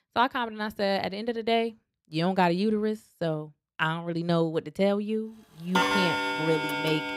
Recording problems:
household noises; very loud; from 5.5 s on; 1 dB above the speech

